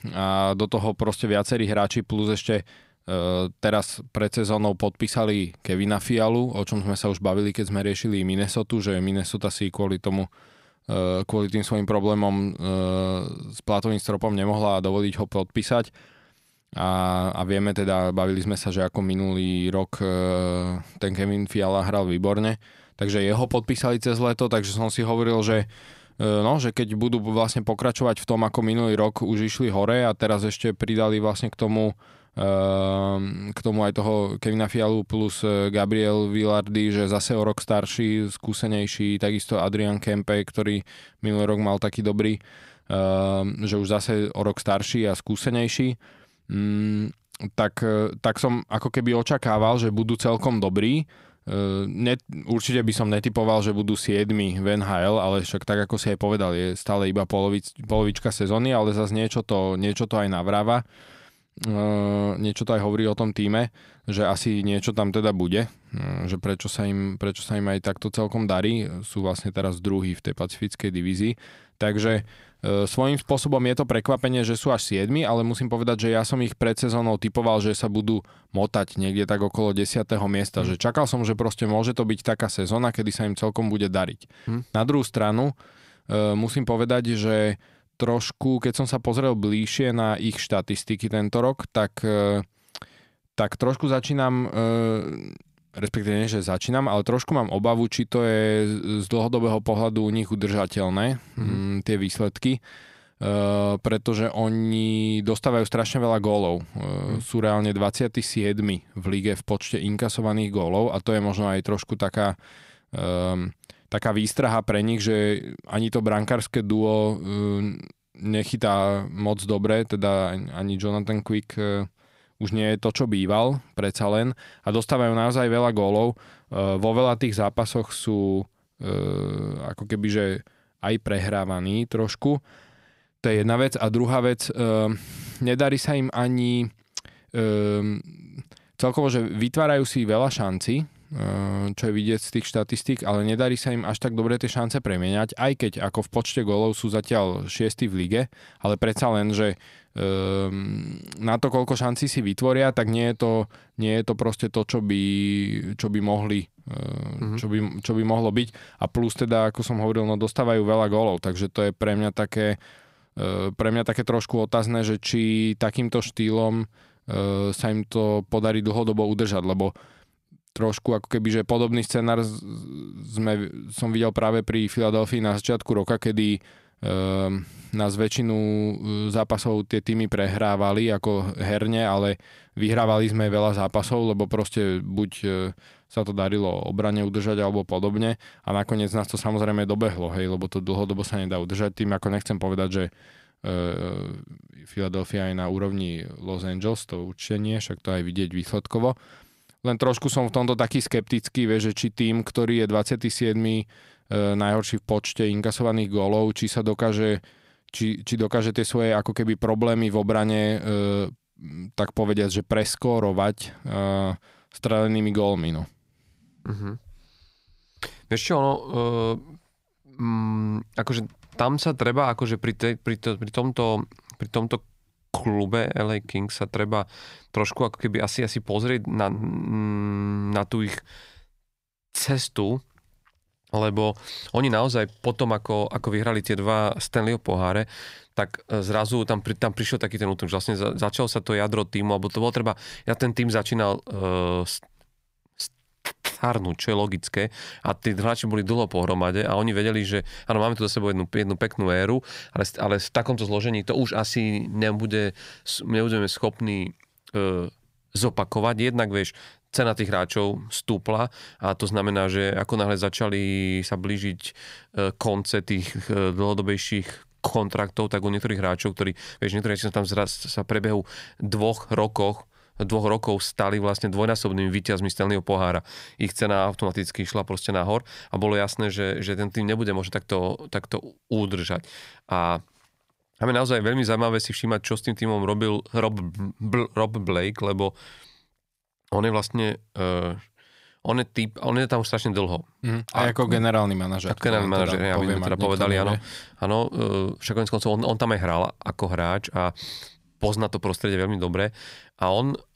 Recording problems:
none

